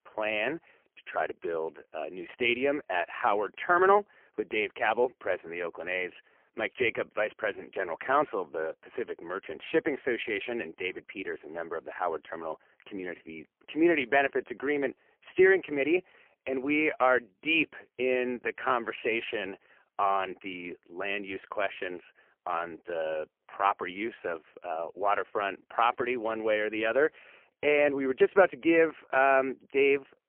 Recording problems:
phone-call audio; poor line; nothing above 3 kHz

